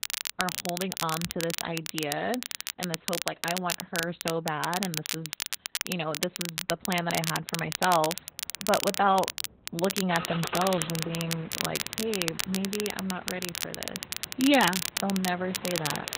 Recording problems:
garbled, watery; badly; nothing above 4 kHz
crackle, like an old record; loud; 3 dB below the speech
traffic noise; noticeable; throughout; 10 dB below the speech

